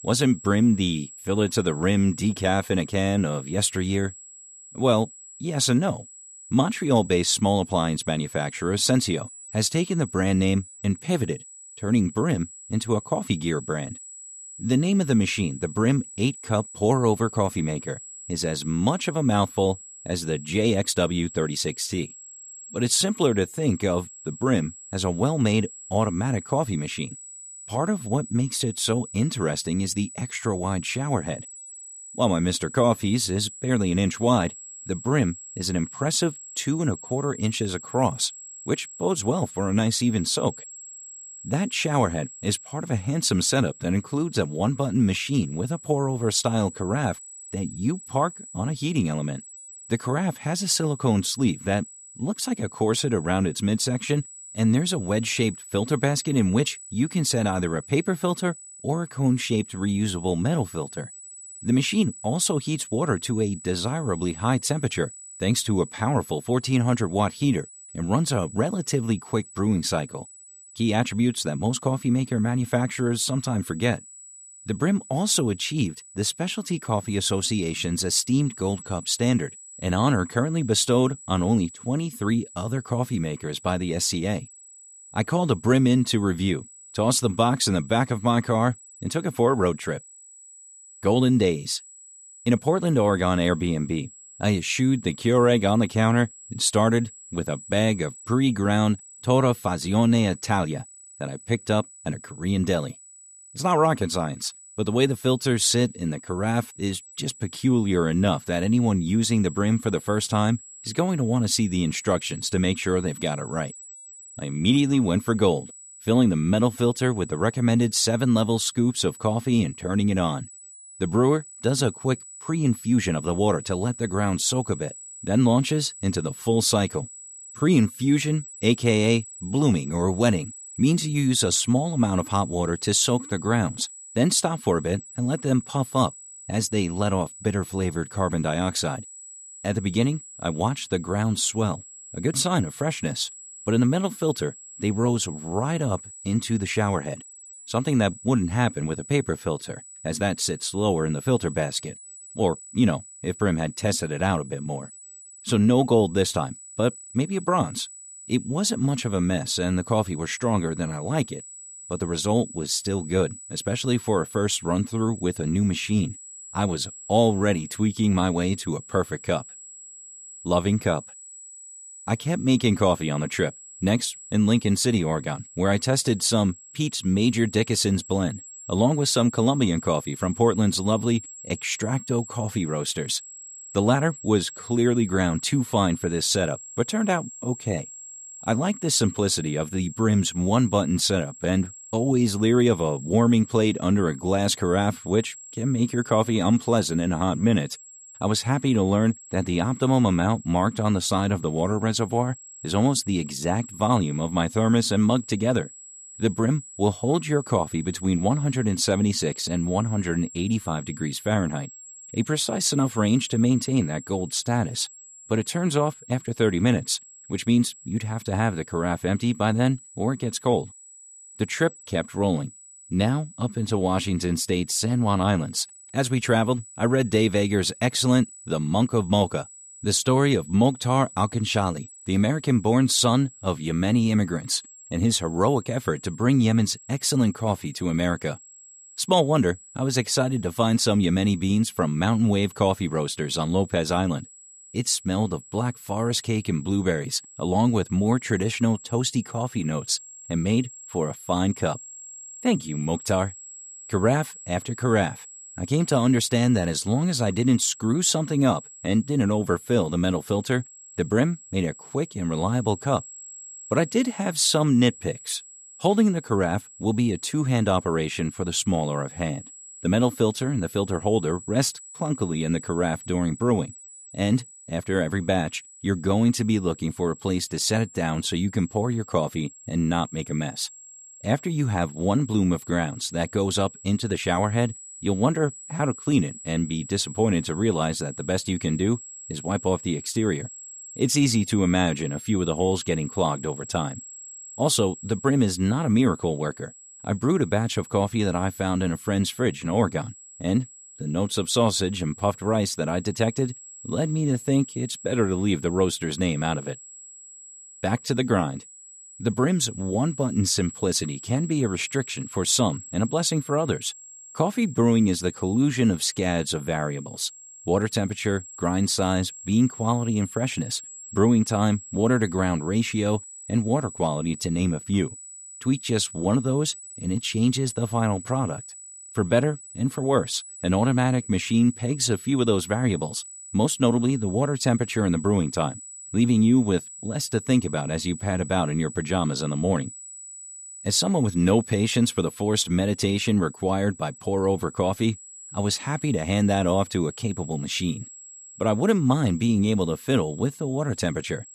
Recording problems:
high-pitched whine; noticeable; throughout; 8 kHz, 15 dB below the speech

